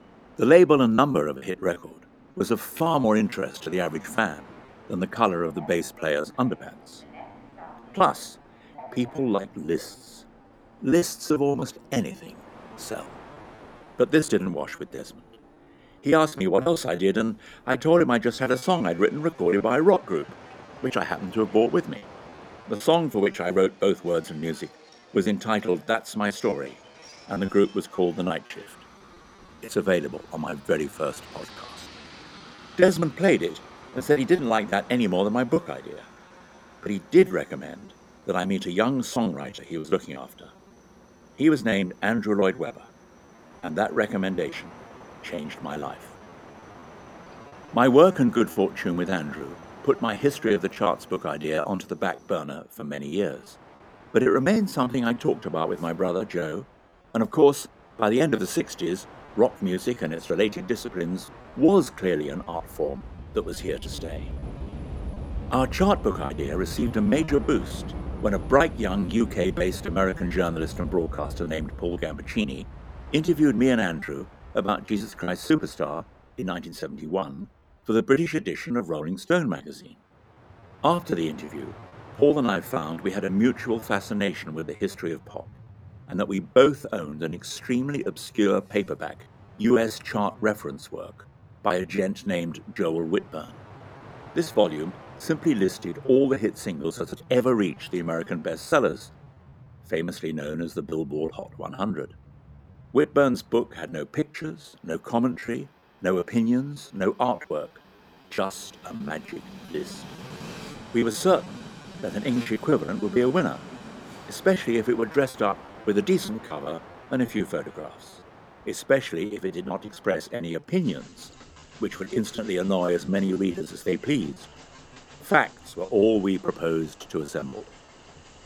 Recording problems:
train or aircraft noise; noticeable; throughout; 20 dB below the speech
choppy; very; 12% of the speech affected

